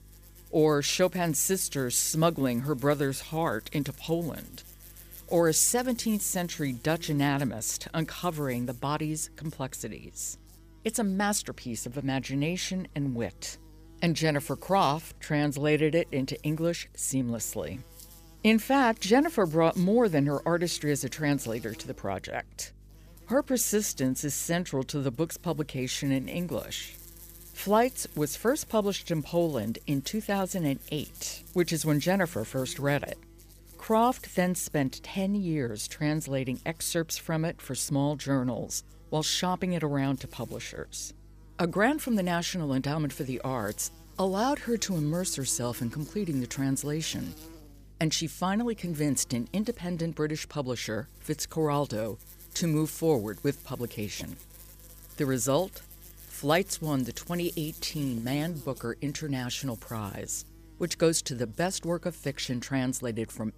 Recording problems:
electrical hum; faint; throughout; 50 Hz, 25 dB below the speech

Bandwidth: 15 kHz